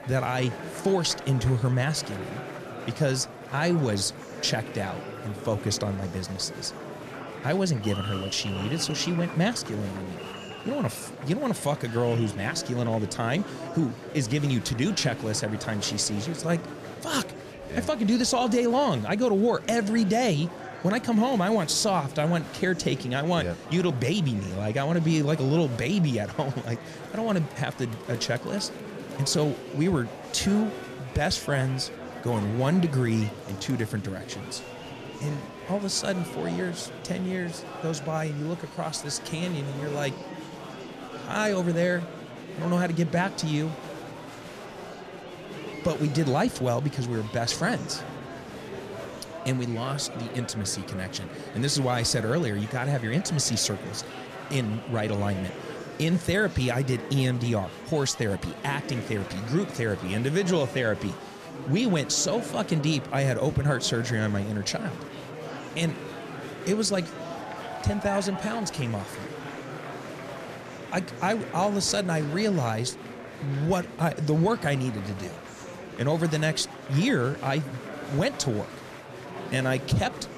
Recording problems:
murmuring crowd; noticeable; throughout; 10 dB below the speech

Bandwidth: 14.5 kHz